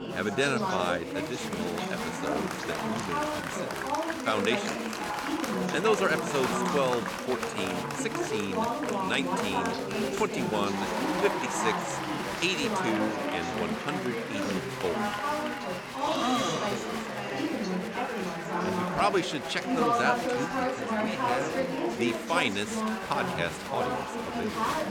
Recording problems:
chatter from many people; very loud; throughout; 1 dB above the speech

